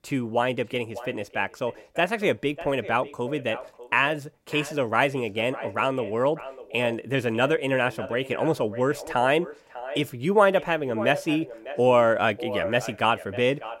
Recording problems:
echo of what is said; noticeable; throughout; 600 ms later, 15 dB below the speech

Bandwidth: 16 kHz